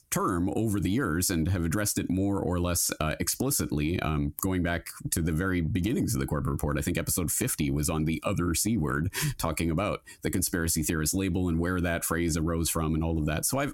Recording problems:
squashed, flat; heavily

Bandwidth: 16.5 kHz